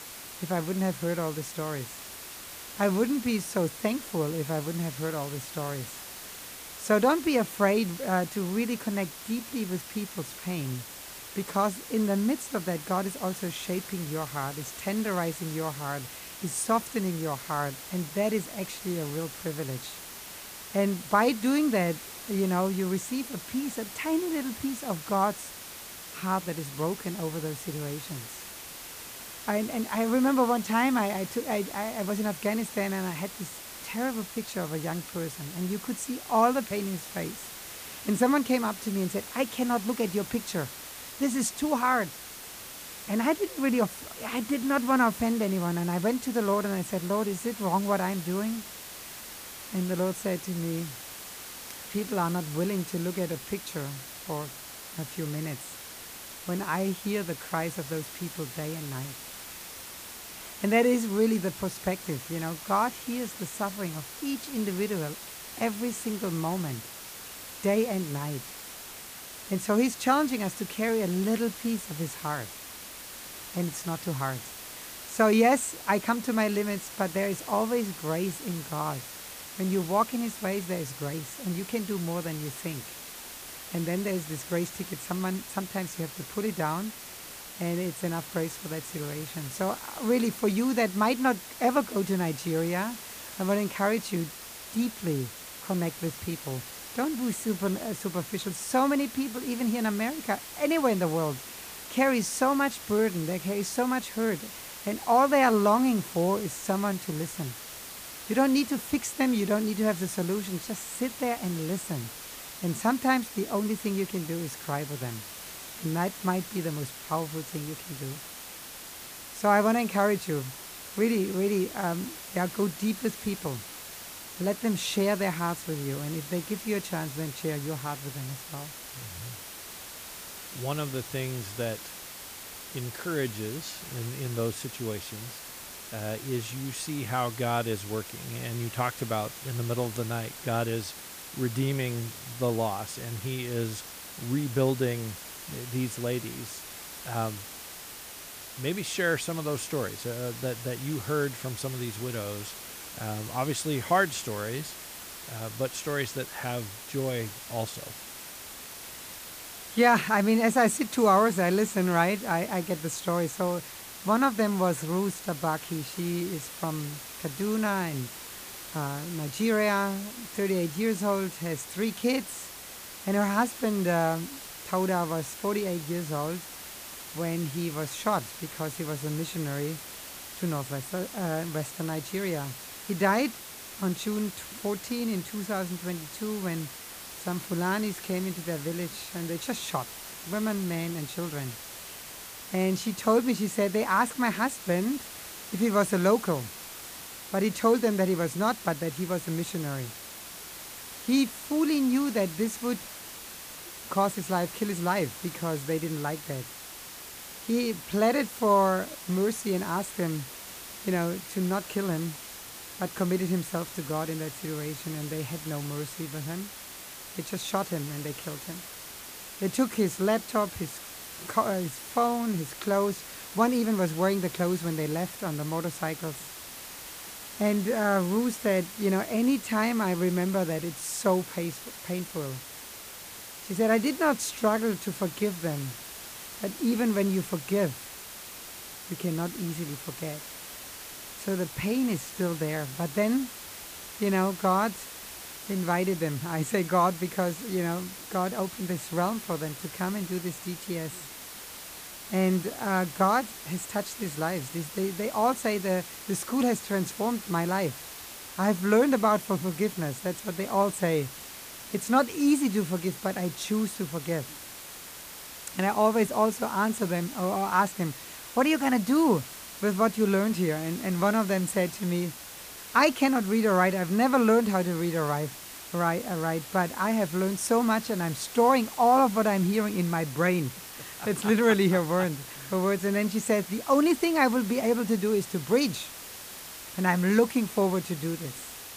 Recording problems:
hiss; noticeable; throughout; 10 dB below the speech

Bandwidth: 15 kHz